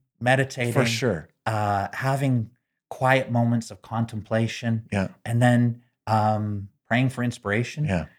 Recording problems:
none

